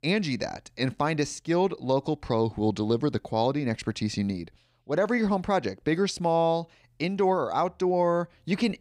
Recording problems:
none

